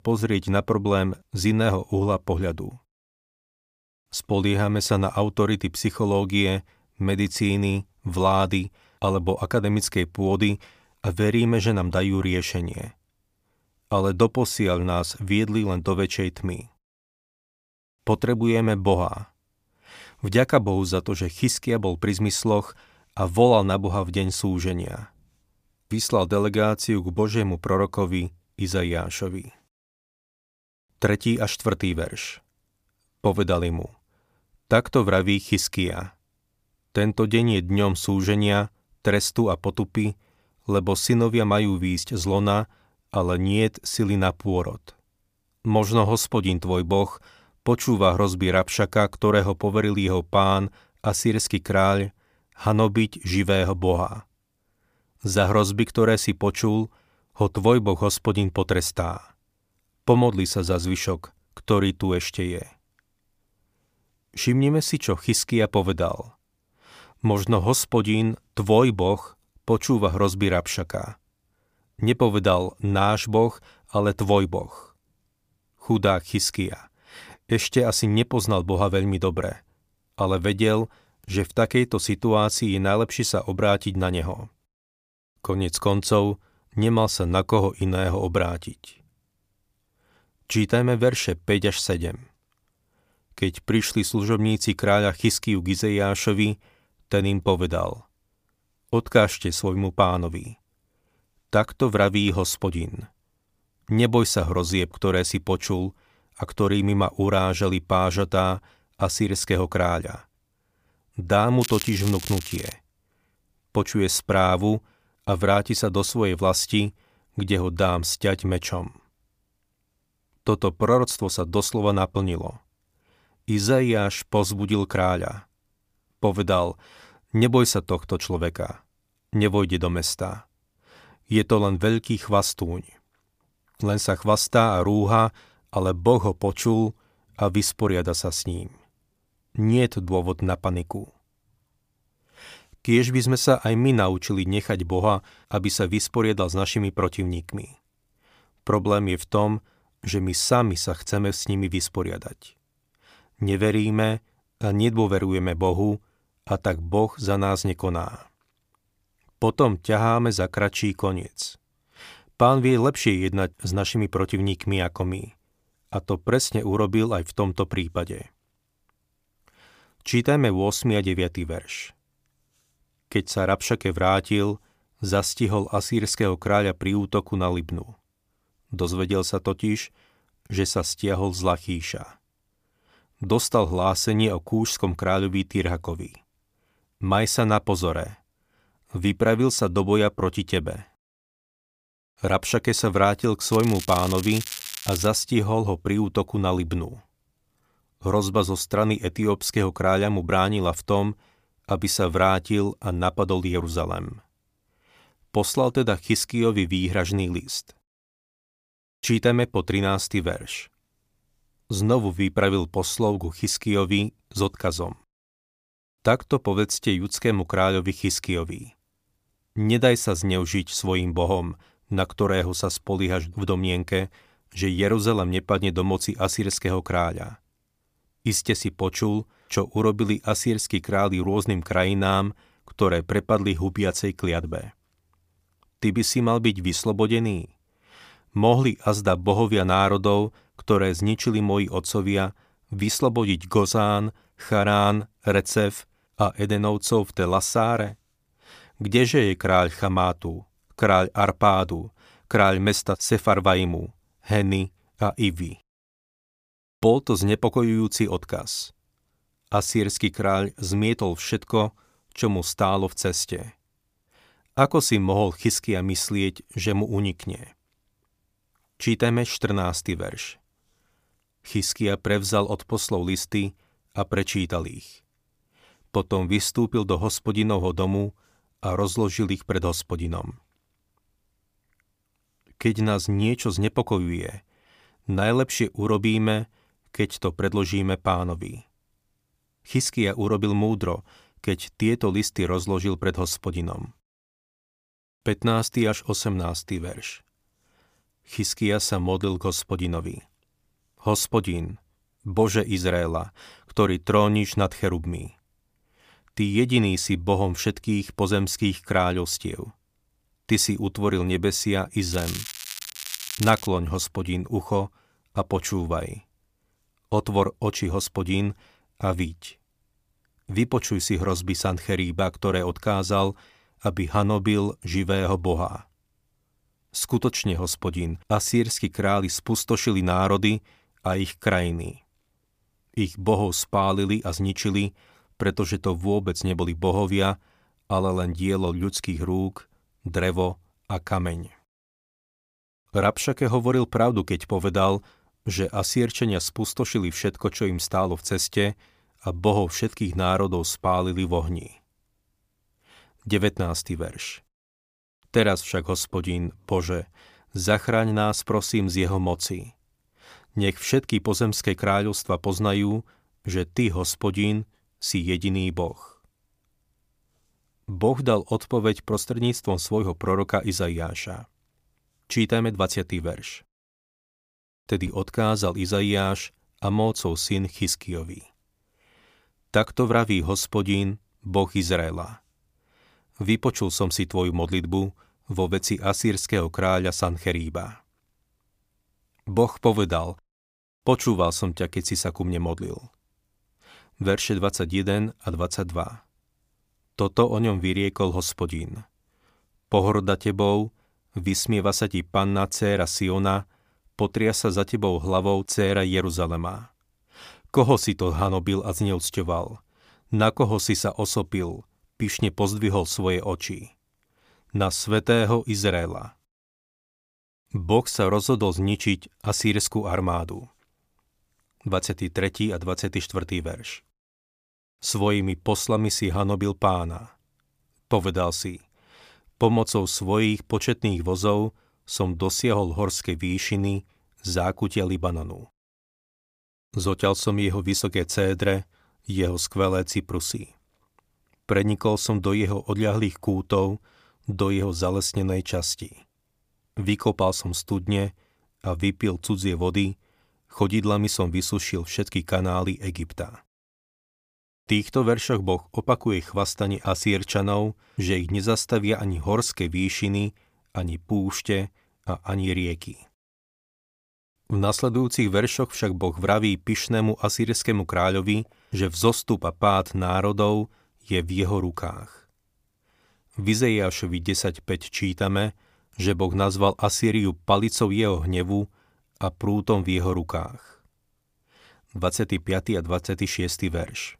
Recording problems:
crackling; loud; from 1:52 to 1:53, from 3:14 to 3:15 and from 5:12 to 5:14; 9 dB below the speech

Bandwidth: 15 kHz